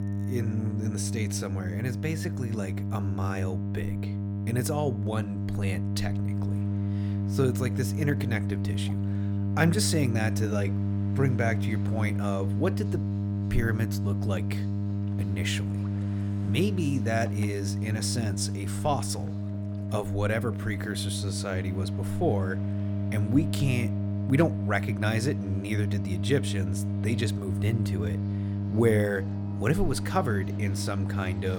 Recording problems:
electrical hum; loud; throughout; 50 Hz, 7 dB below the speech
background music; faint; throughout; 20 dB below the speech
train or aircraft noise; faint; from 6.5 s on; 25 dB below the speech
abrupt cut into speech; at the end

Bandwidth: 17.5 kHz